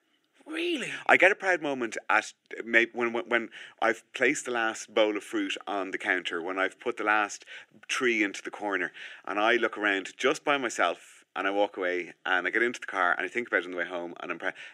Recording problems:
thin; somewhat; fading below 300 Hz

